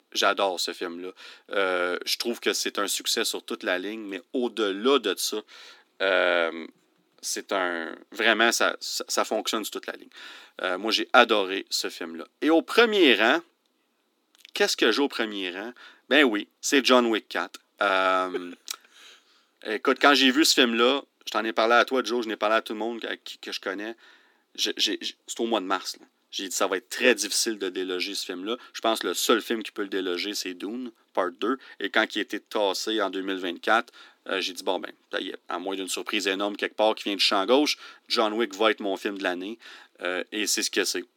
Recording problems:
thin; somewhat; fading below 250 Hz

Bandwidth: 17 kHz